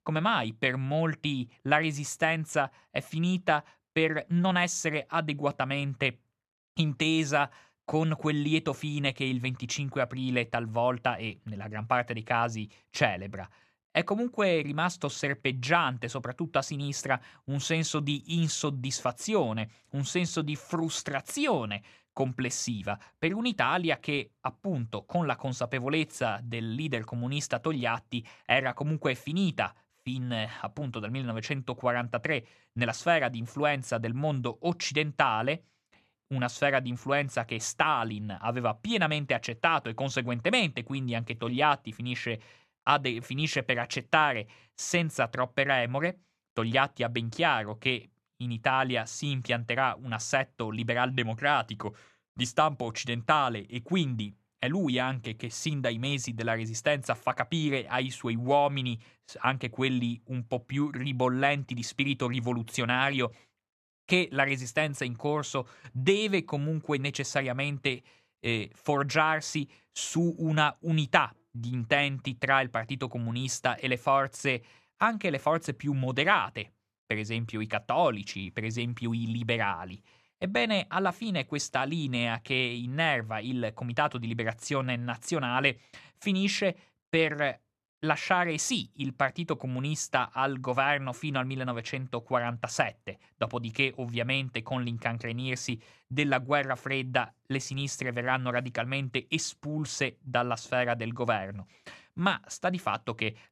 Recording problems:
none

